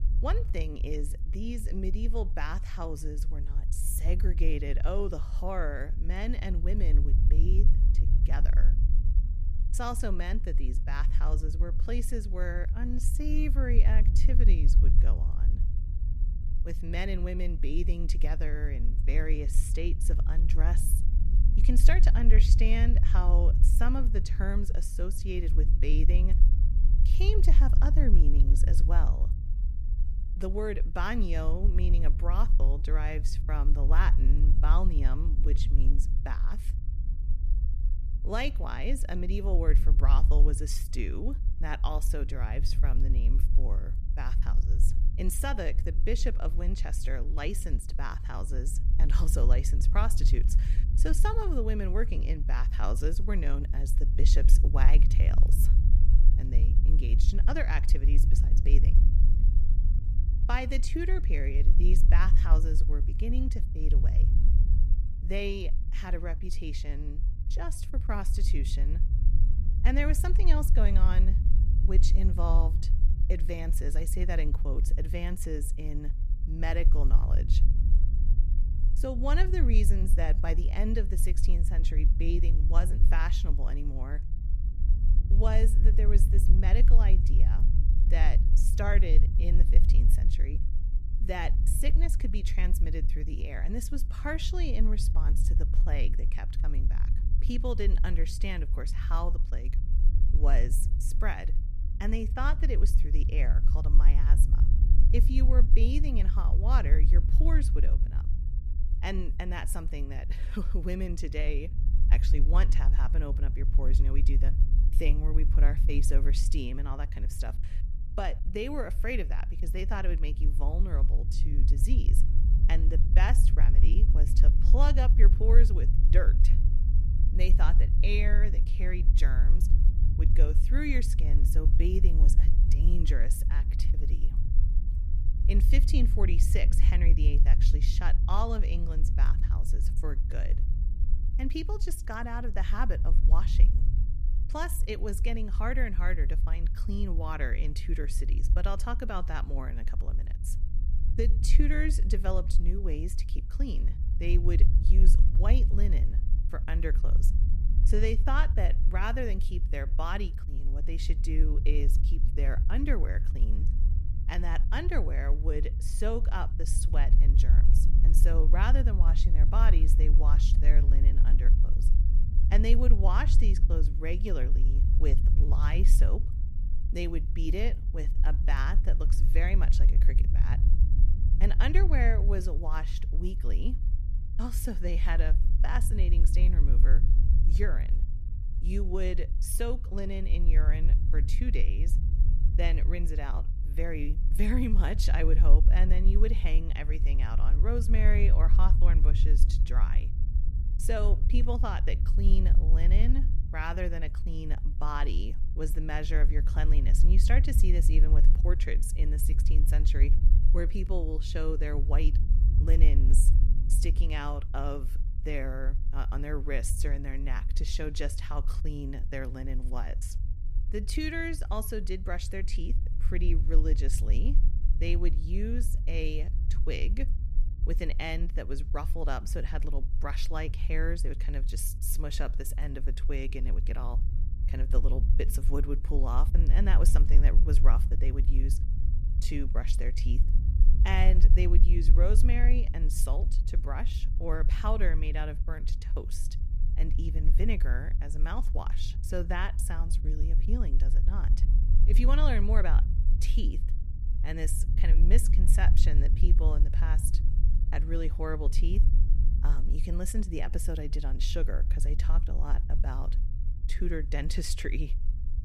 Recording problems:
low rumble; loud; throughout; 10 dB below the speech

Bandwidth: 14 kHz